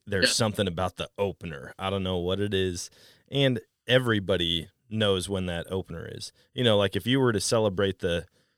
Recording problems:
none

